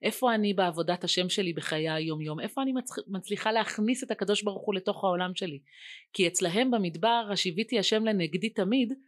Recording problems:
none

